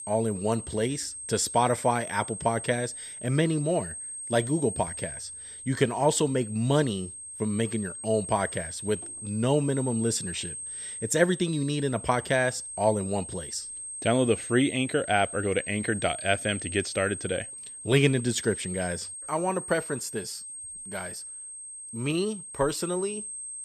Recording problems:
high-pitched whine; loud; throughout; 8.5 kHz, 9 dB below the speech

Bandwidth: 13.5 kHz